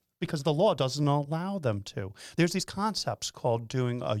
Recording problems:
uneven, jittery; strongly
abrupt cut into speech; at the end

